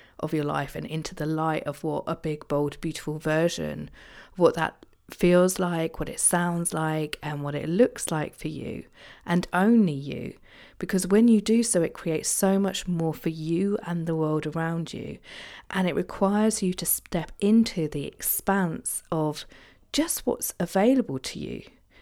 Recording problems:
none

